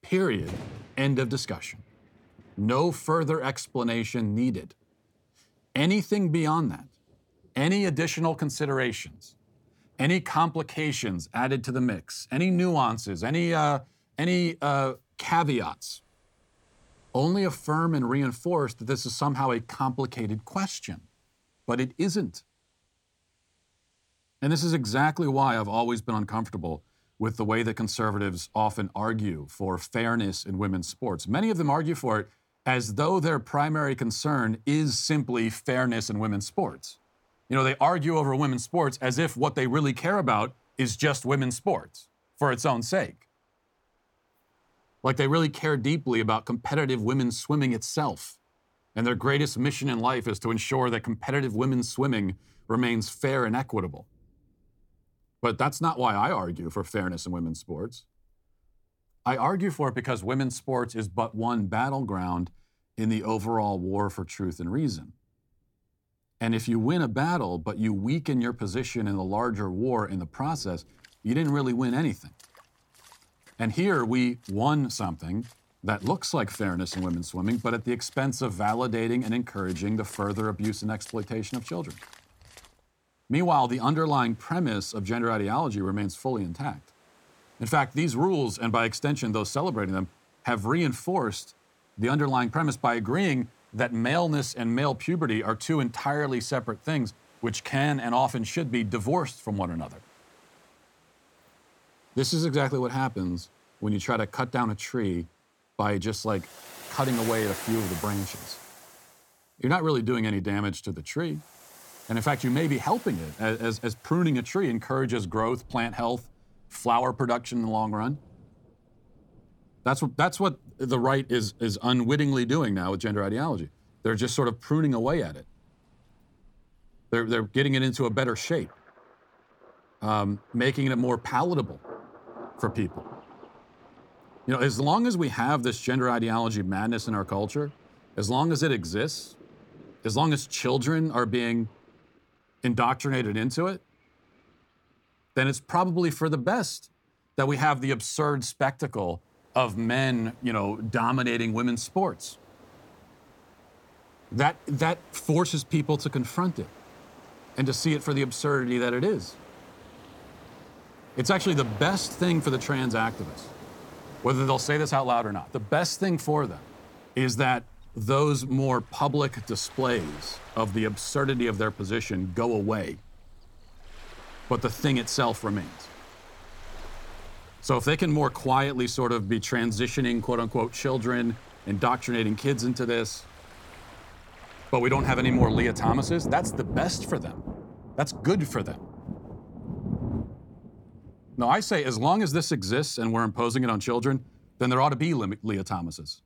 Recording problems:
rain or running water; noticeable; throughout; 15 dB below the speech

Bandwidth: 18 kHz